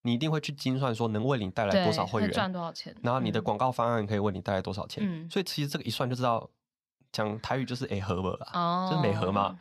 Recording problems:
none

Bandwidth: 14 kHz